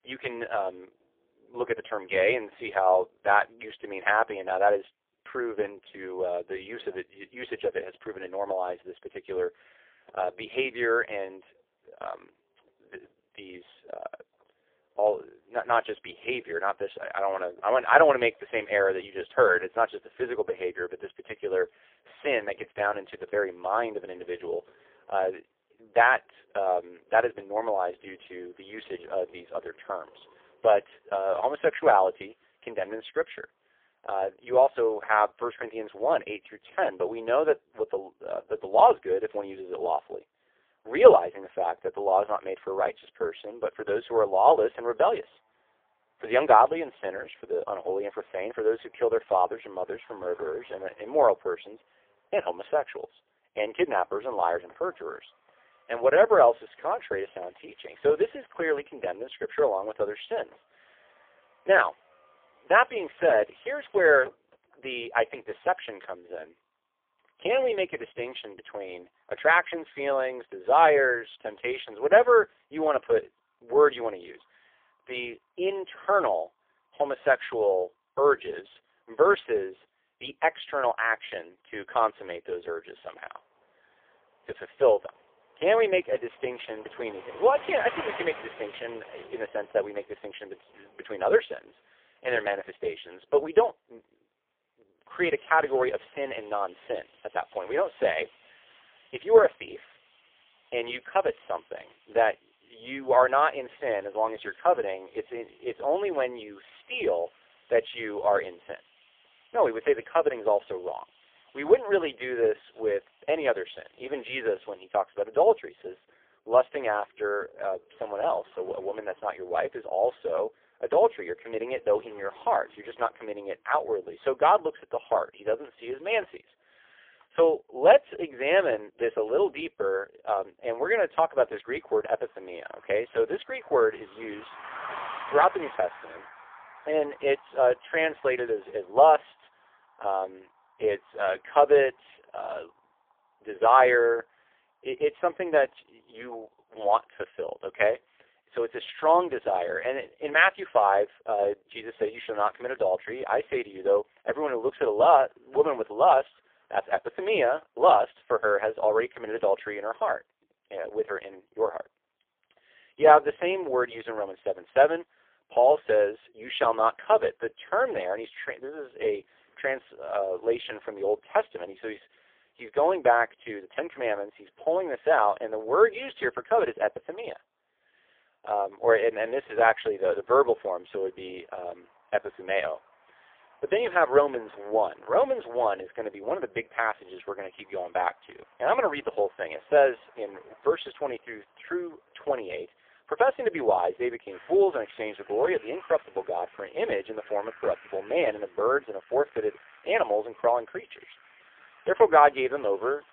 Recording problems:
phone-call audio; poor line; nothing above 3.5 kHz
traffic noise; faint; throughout; 25 dB below the speech

